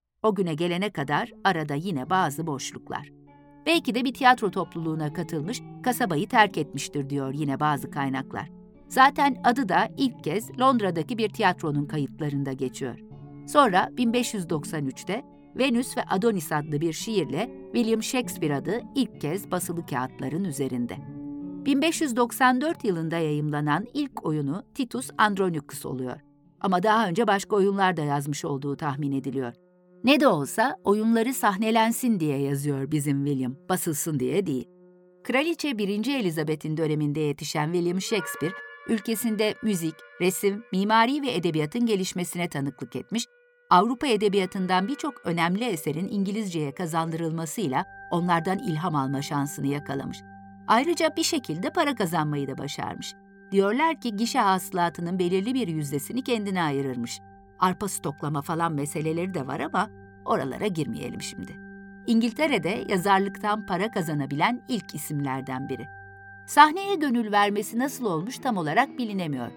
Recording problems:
background music; noticeable; throughout; 20 dB below the speech

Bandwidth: 17.5 kHz